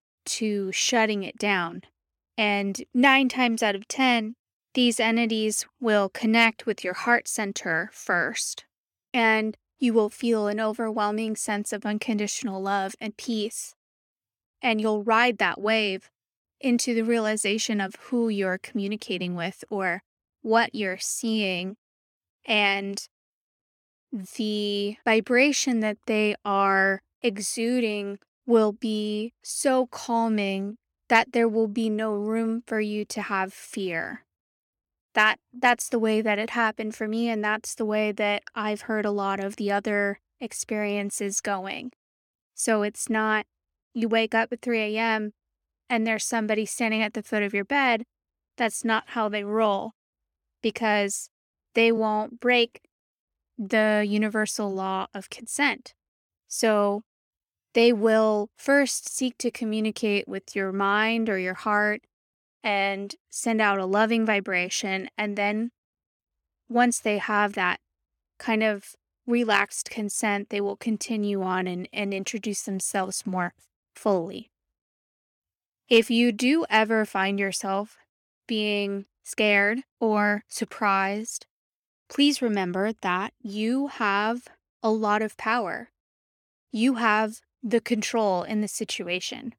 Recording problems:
uneven, jittery; slightly; from 52 s to 1:21

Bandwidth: 17 kHz